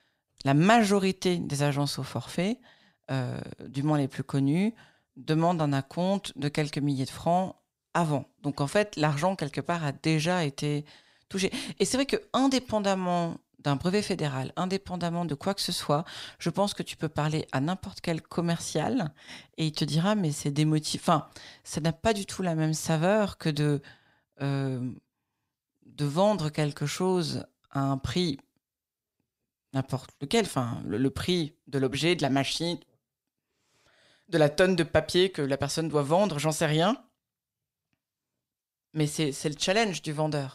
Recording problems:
none

